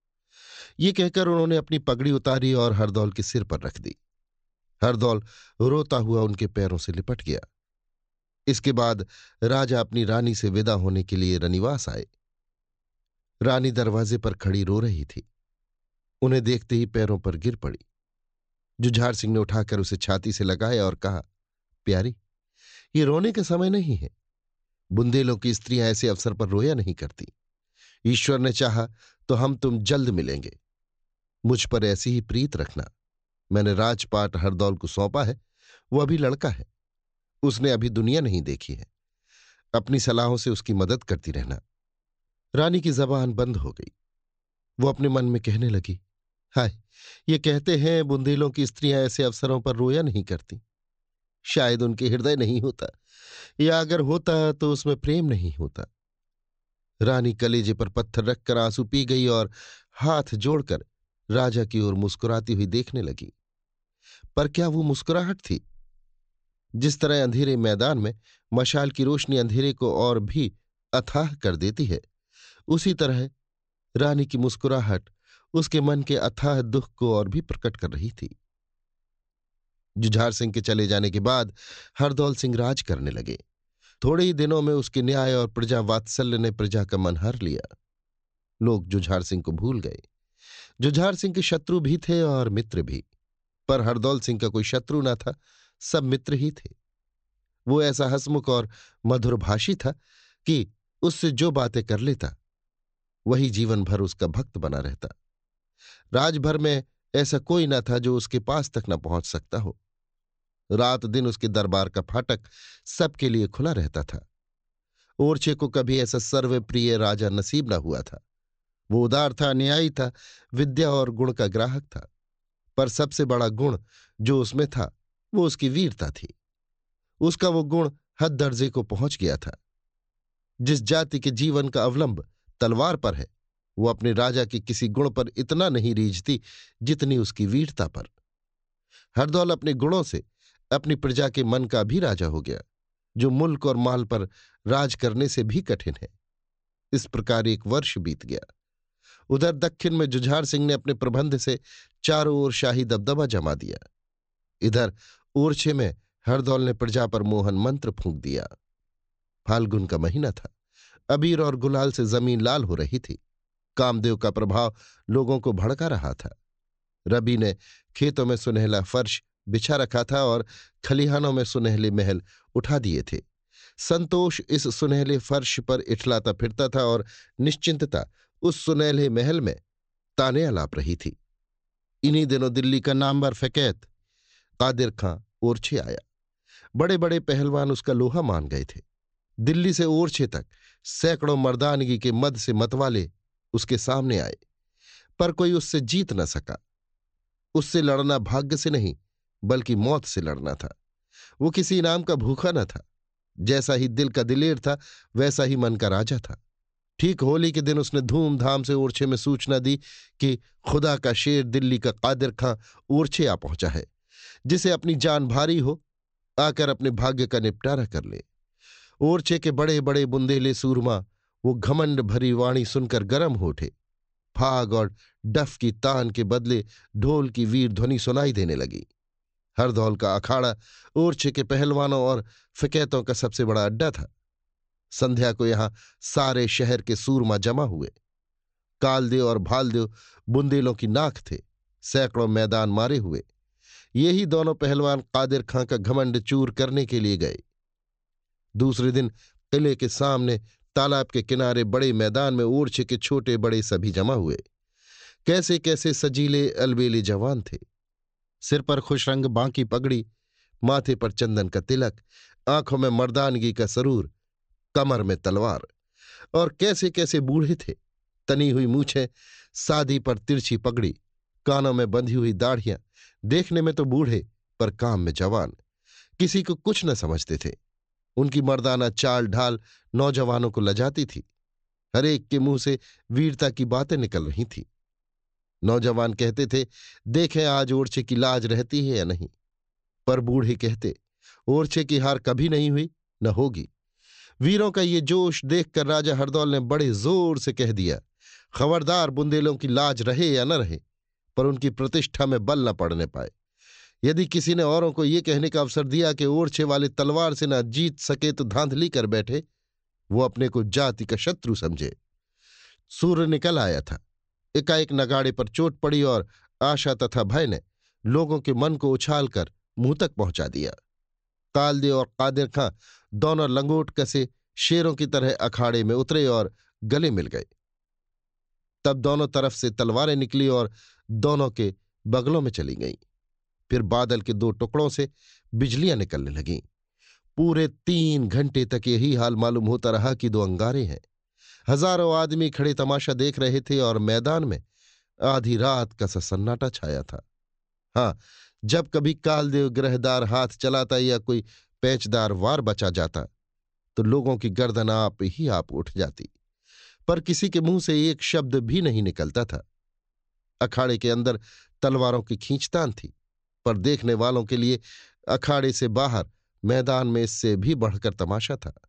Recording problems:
high frequencies cut off; noticeable; nothing above 8 kHz

